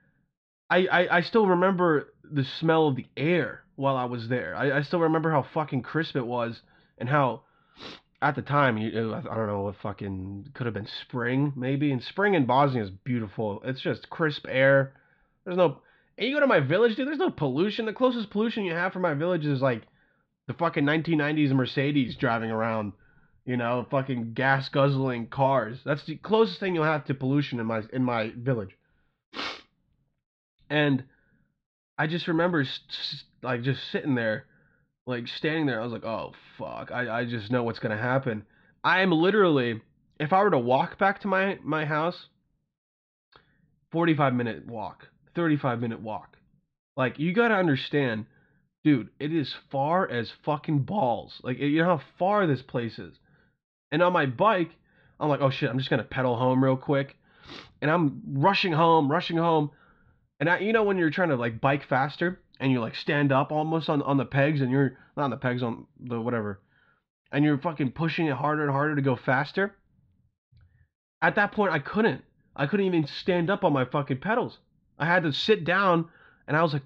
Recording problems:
muffled; slightly; fading above 4 kHz

